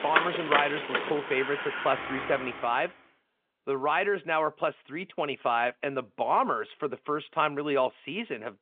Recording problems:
phone-call audio
traffic noise; loud; until 2.5 s; 2 dB below the speech

